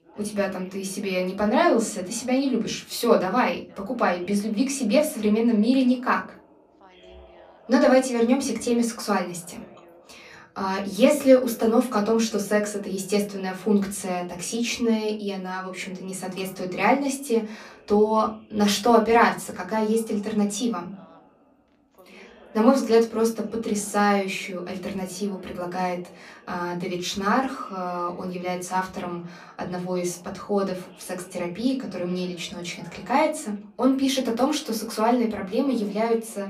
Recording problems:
off-mic speech; far
room echo; very slight; dies away in 0.3 s
background chatter; faint; throughout; 2 voices, 25 dB below the speech

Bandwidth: 14.5 kHz